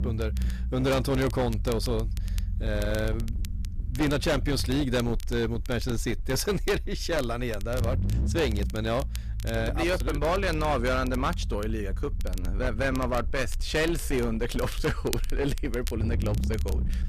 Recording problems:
distortion; slight; 12% of the sound clipped
low rumble; noticeable; throughout; 15 dB below the speech
crackle, like an old record; noticeable; 20 dB below the speech

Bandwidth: 14.5 kHz